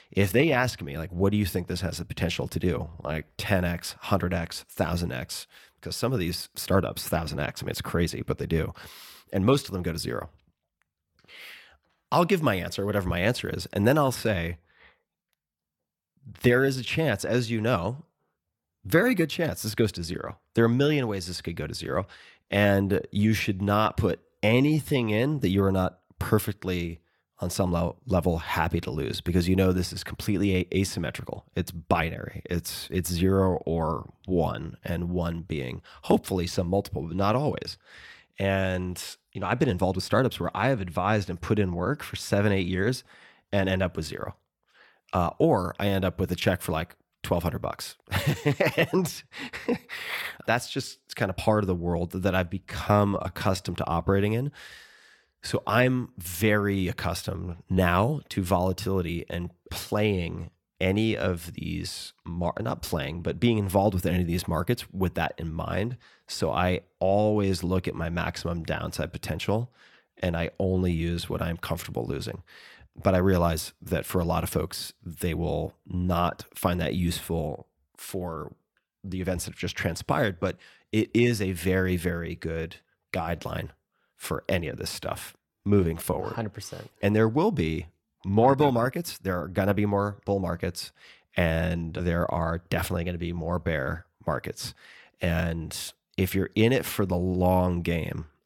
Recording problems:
uneven, jittery; strongly; from 3 s to 1:26

